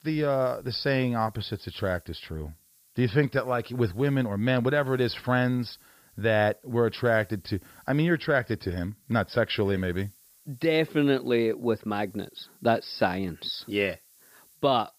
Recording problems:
high frequencies cut off; noticeable; nothing above 5.5 kHz
hiss; faint; throughout; 30 dB below the speech

